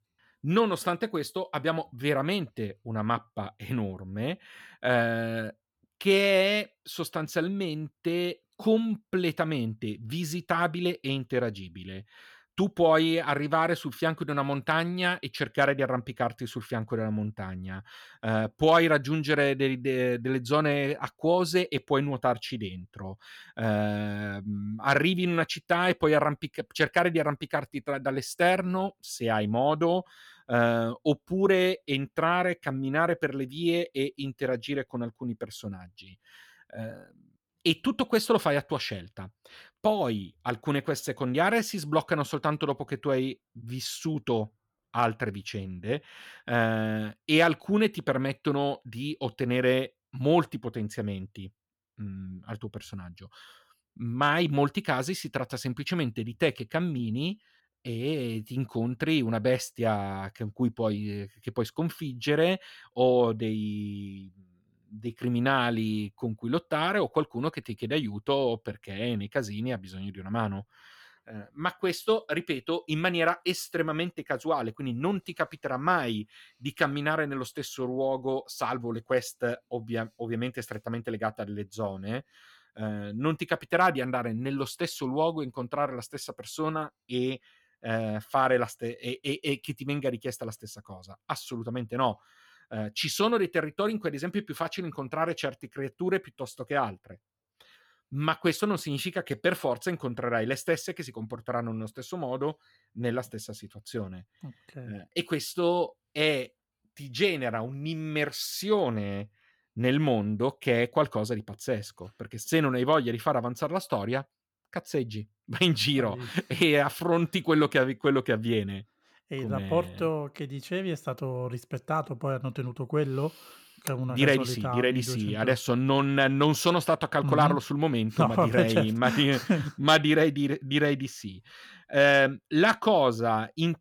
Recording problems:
none

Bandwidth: 18.5 kHz